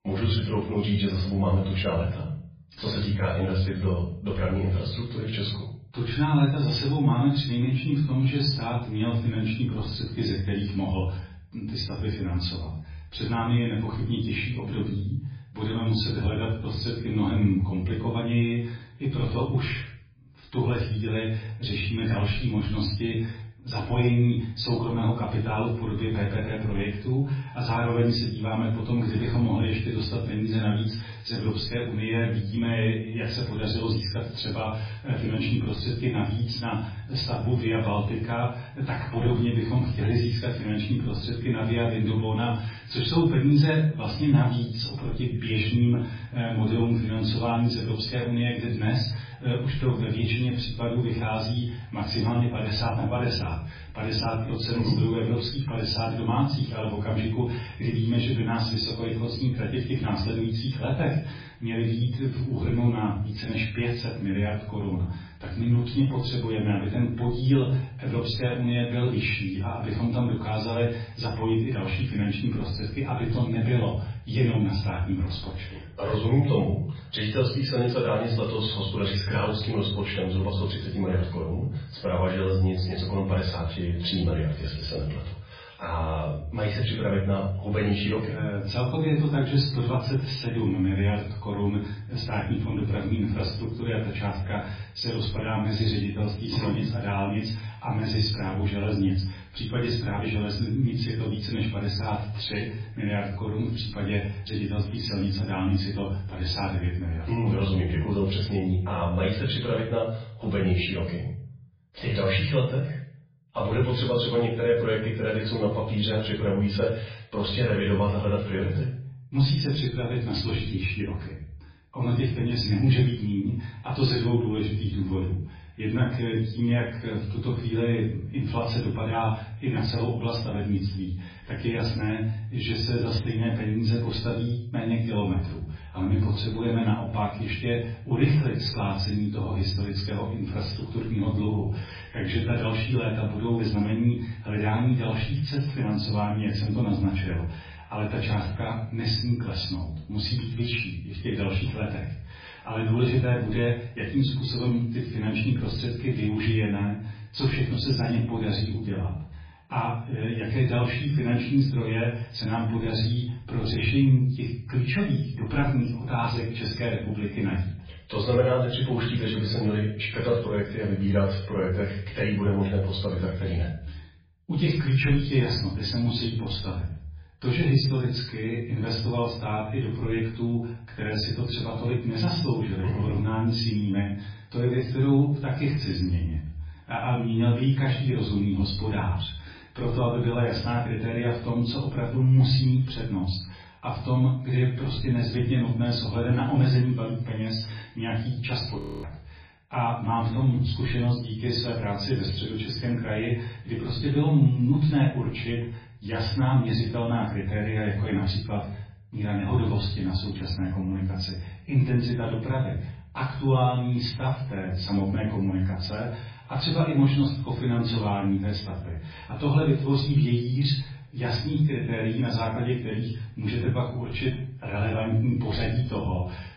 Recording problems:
off-mic speech; far
garbled, watery; badly; nothing above 5 kHz
room echo; noticeable; dies away in 0.5 s
audio freezing; at 3:19

